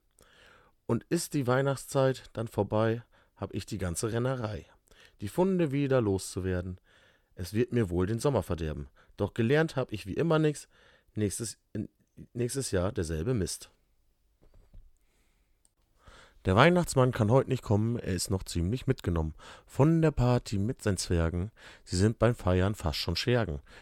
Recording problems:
none

